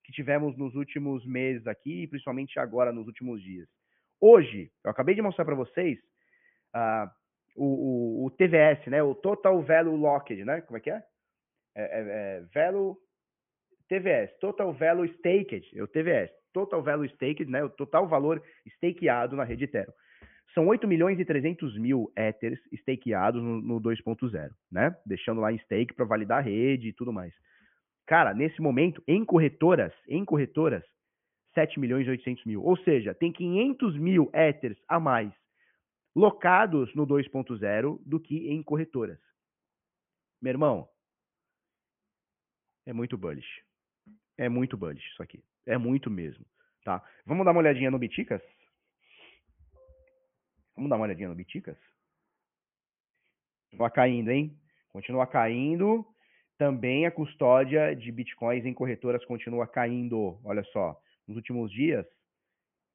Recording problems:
high frequencies cut off; severe; nothing above 3 kHz

